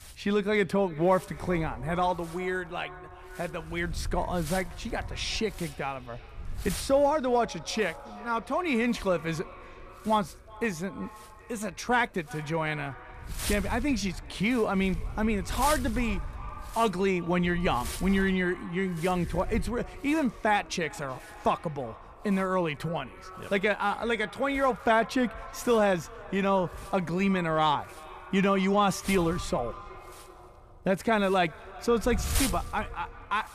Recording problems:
echo of what is said; faint; throughout; 370 ms later, 20 dB below the speech
wind noise on the microphone; occasional gusts; 15 dB below the speech

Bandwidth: 14.5 kHz